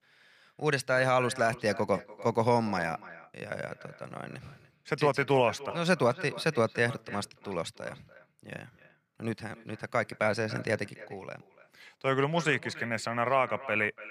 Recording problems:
echo of what is said; noticeable; throughout; 290 ms later, 15 dB below the speech

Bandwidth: 15 kHz